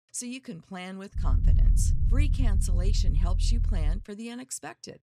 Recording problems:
low rumble; loud; from 1 to 4 s; 6 dB below the speech

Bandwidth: 14 kHz